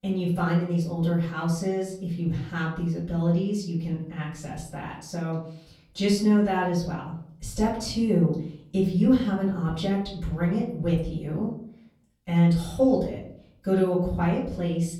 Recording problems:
off-mic speech; far
room echo; noticeable; dies away in 0.6 s

